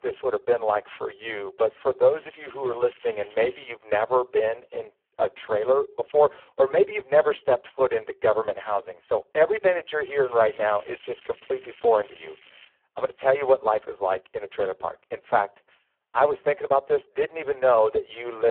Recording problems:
phone-call audio; poor line
crackling; faint; from 2 to 3.5 s and from 10 to 13 s; 25 dB below the speech
abrupt cut into speech; at the end

